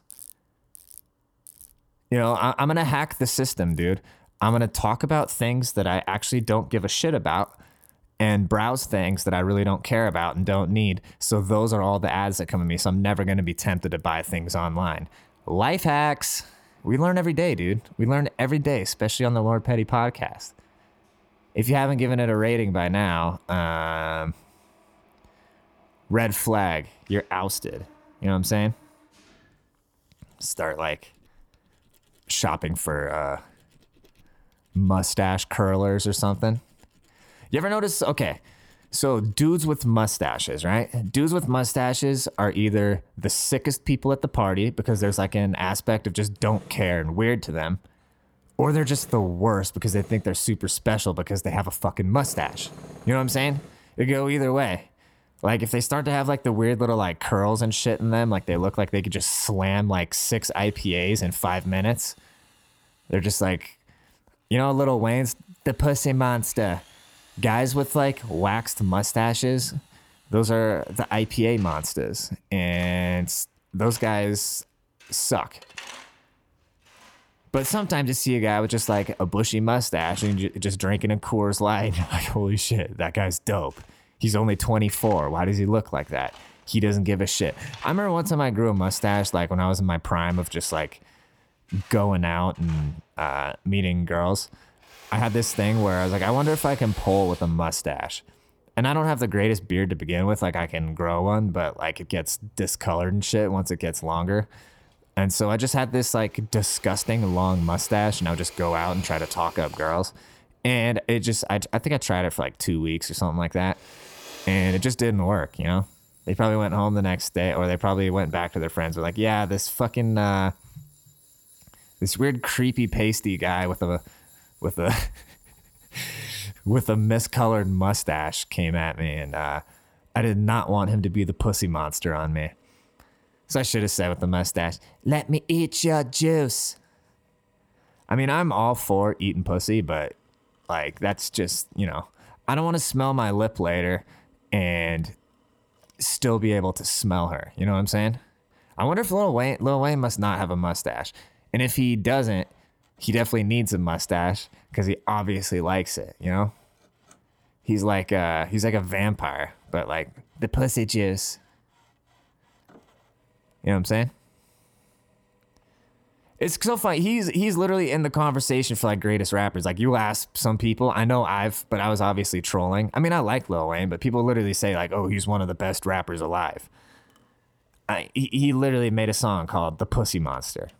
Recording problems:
machinery noise; faint; throughout; 25 dB below the speech

